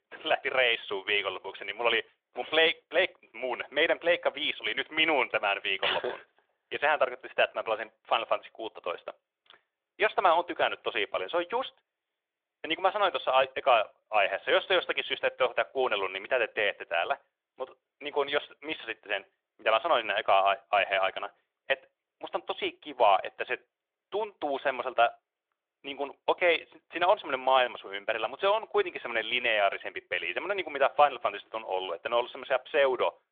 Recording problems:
phone-call audio; nothing above 3.5 kHz

